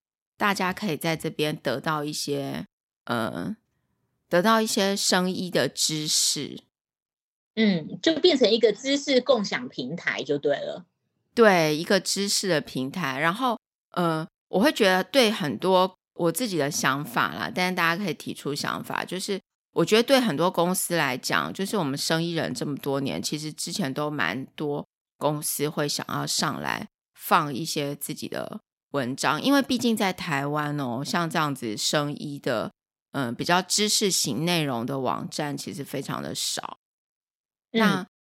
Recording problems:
none

